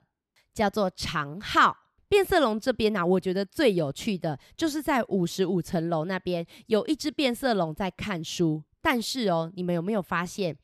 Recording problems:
none

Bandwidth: 13.5 kHz